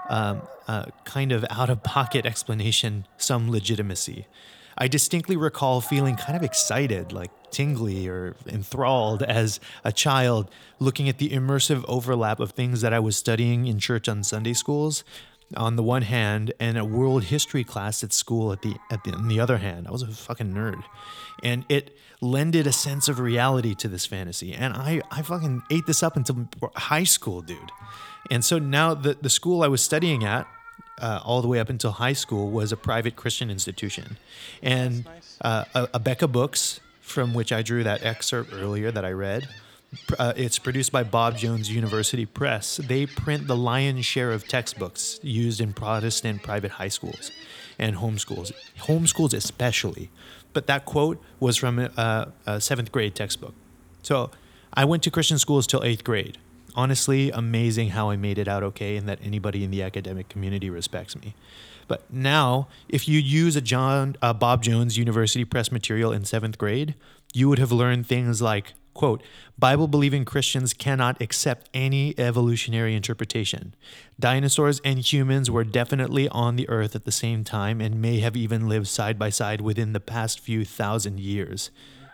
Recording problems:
animal sounds; faint; throughout; 20 dB below the speech

